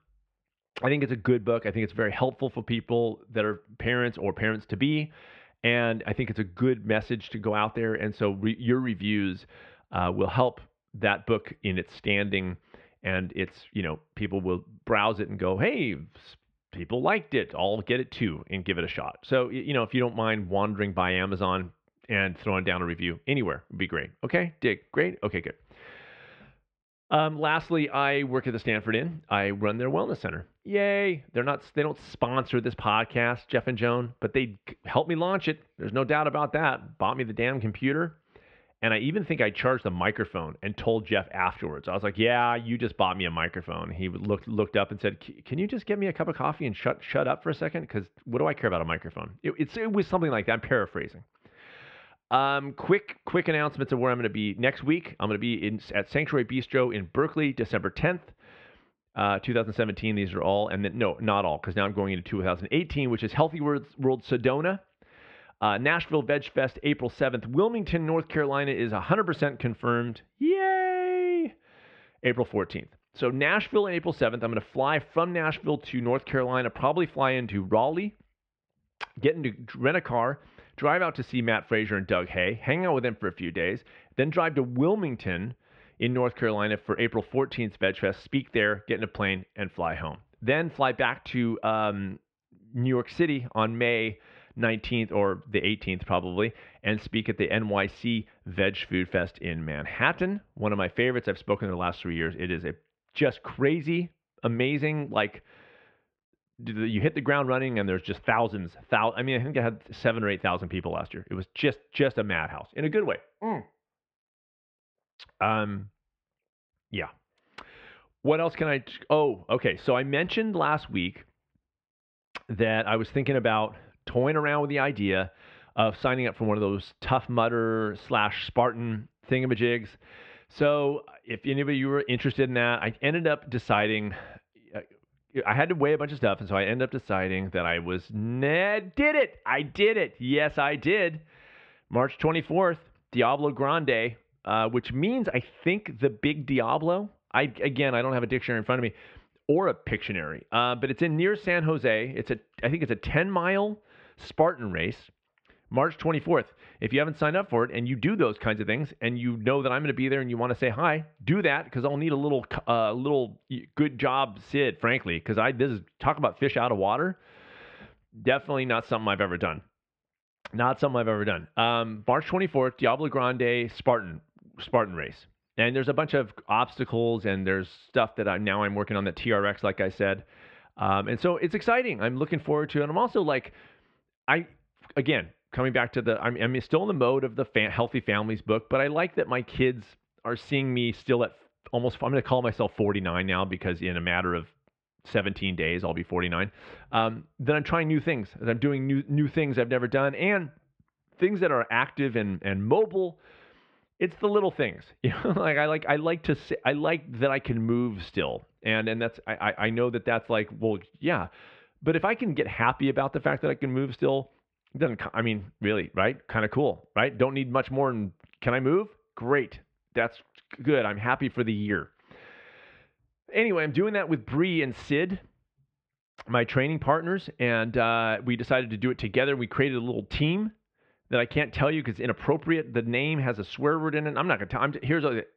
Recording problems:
muffled; very; fading above 3 kHz

